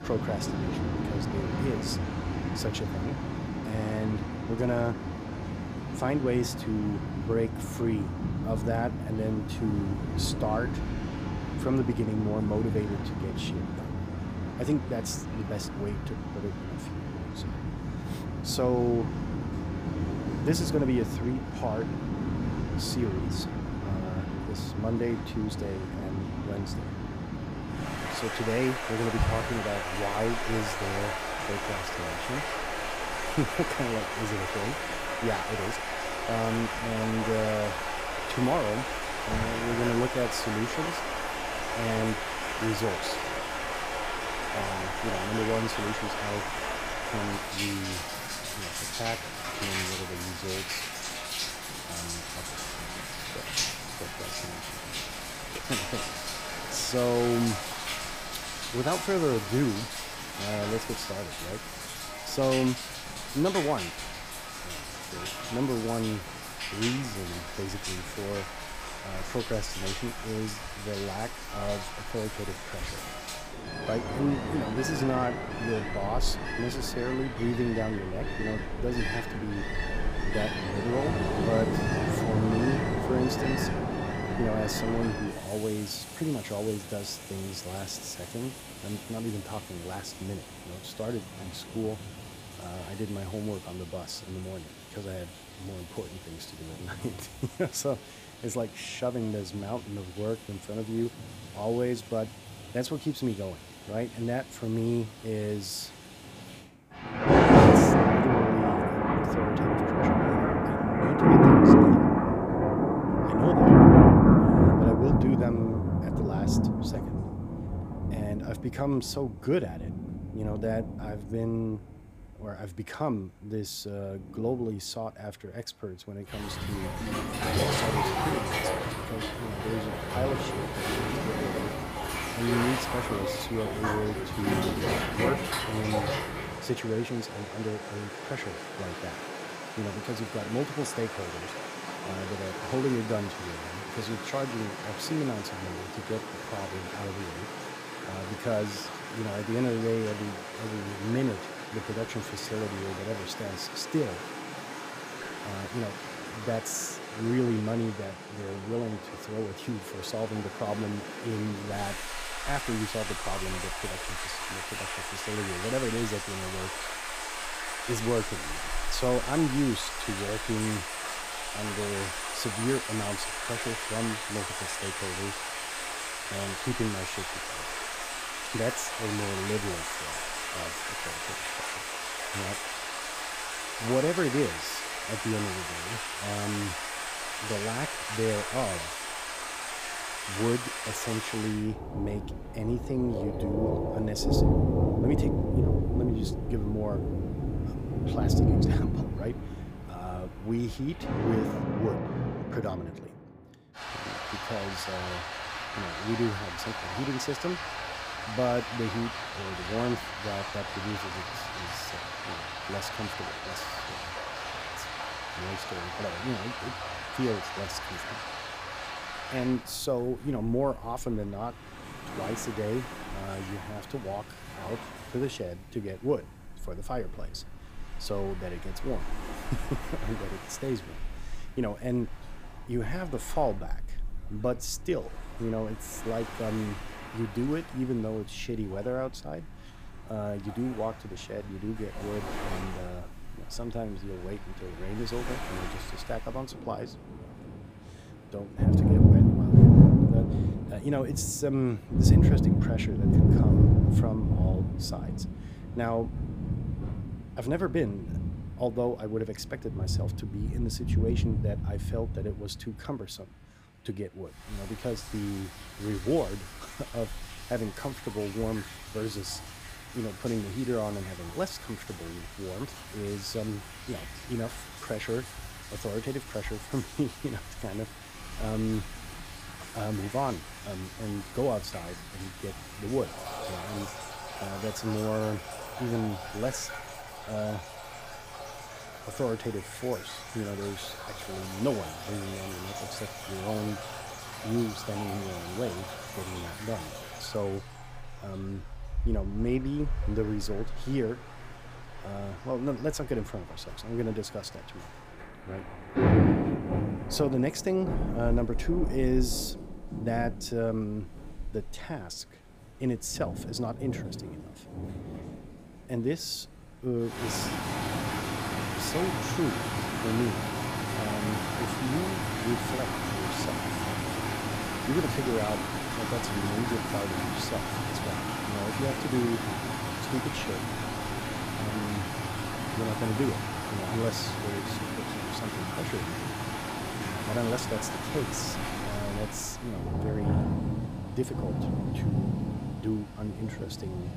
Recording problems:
rain or running water; very loud; throughout; 4 dB above the speech

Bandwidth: 15 kHz